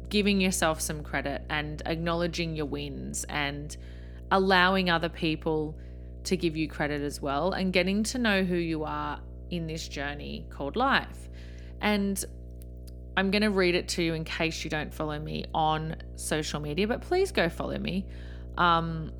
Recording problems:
electrical hum; faint; throughout; 60 Hz, 25 dB below the speech

